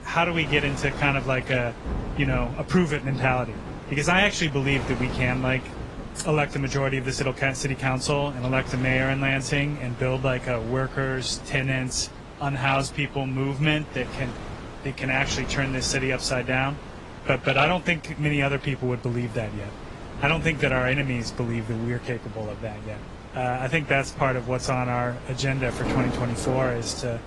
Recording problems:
garbled, watery; slightly; nothing above 10.5 kHz
rain or running water; noticeable; throughout; 15 dB below the speech
wind noise on the microphone; occasional gusts; 15 dB below the speech

